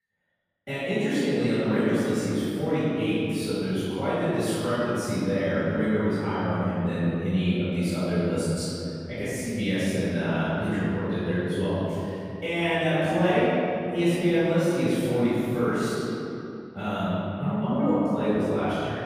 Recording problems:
room echo; strong; dies away in 2.8 s
off-mic speech; far

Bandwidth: 15 kHz